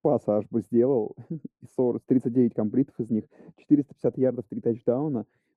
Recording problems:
muffled; very; fading above 1 kHz

